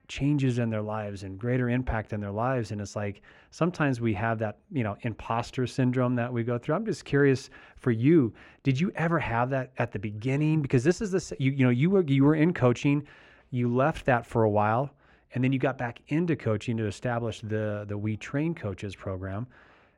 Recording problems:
muffled; slightly; fading above 4 kHz

